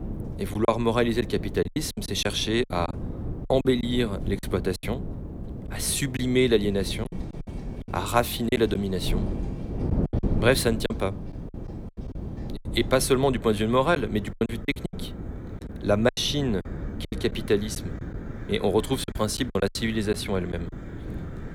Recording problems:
wind noise on the microphone; occasional gusts; 15 dB below the speech
animal sounds; faint; throughout; 30 dB below the speech
choppy; very; 11% of the speech affected

